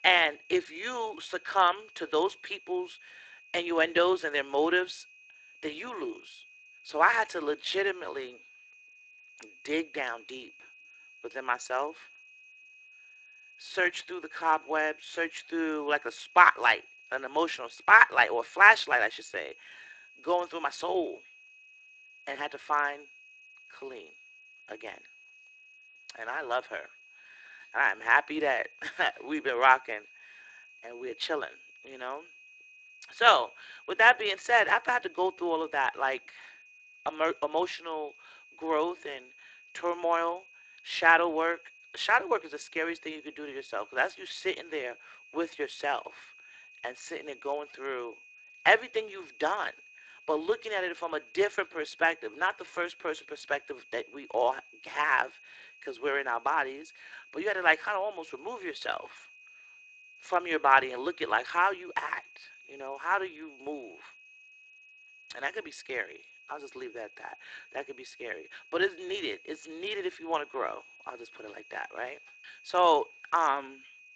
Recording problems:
thin; very; fading below 300 Hz
garbled, watery; slightly; nothing above 7.5 kHz
high-pitched whine; faint; throughout; 2.5 kHz, 25 dB below the speech

